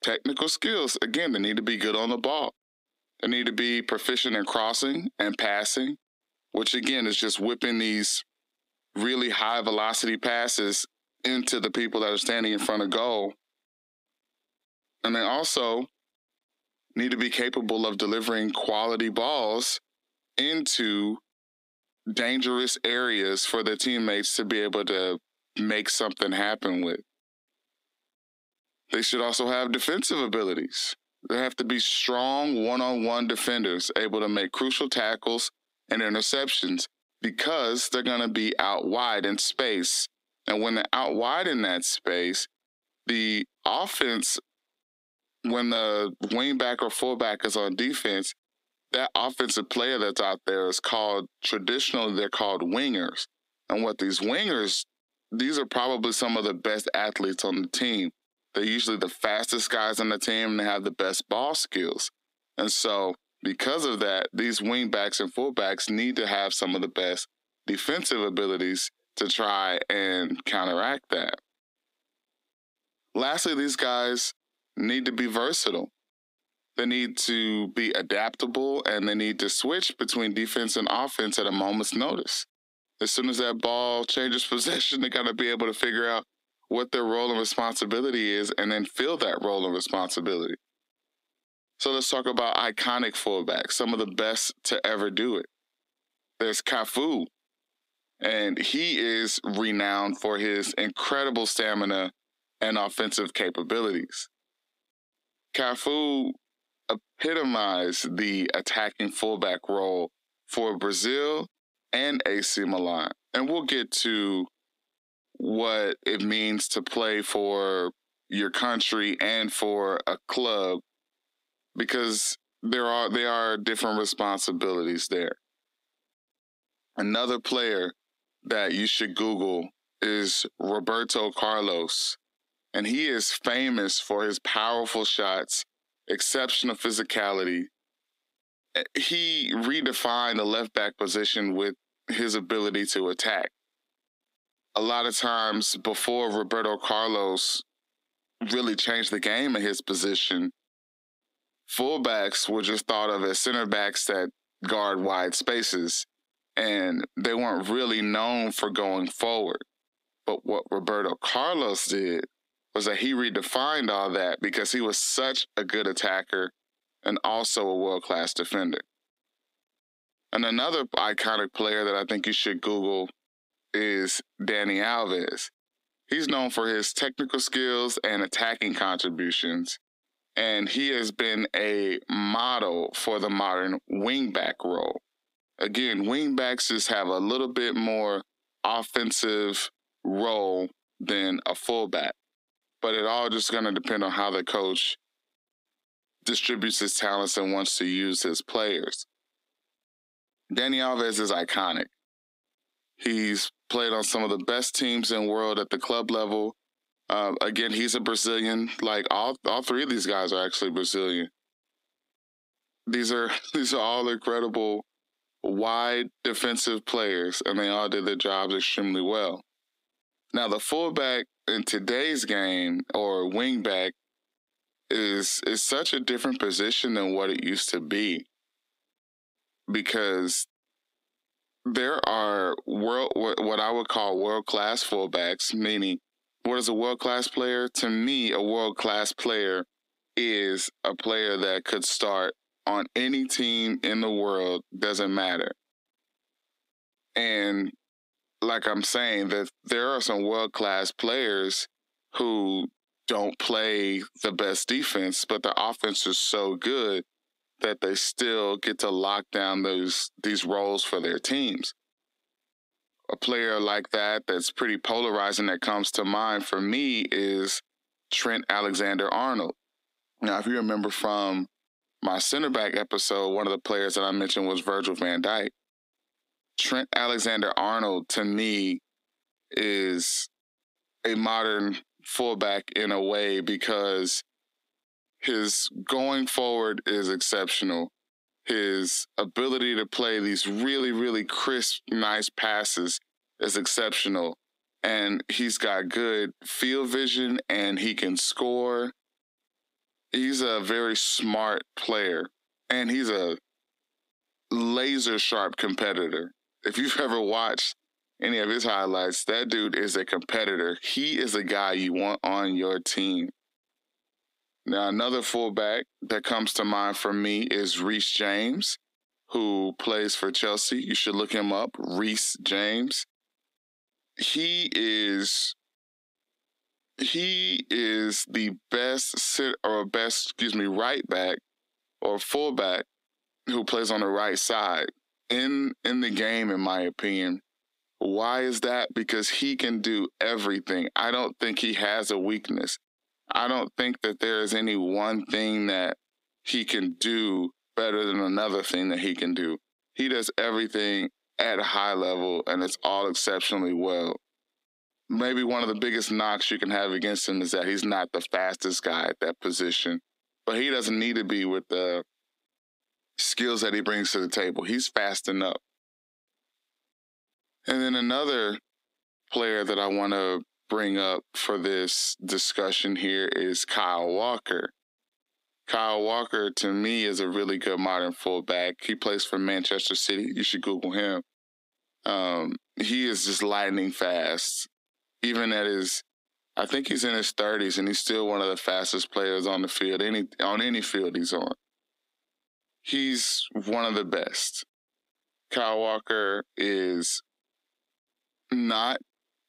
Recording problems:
squashed, flat; heavily
thin; very slightly; fading below 250 Hz

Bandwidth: 15.5 kHz